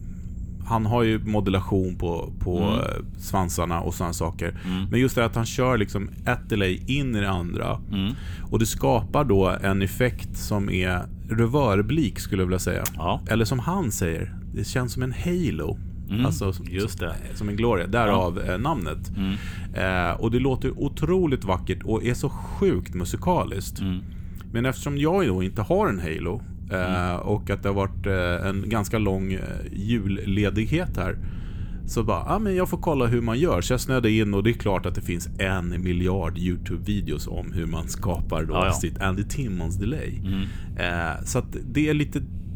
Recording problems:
low rumble; faint; throughout; 20 dB below the speech

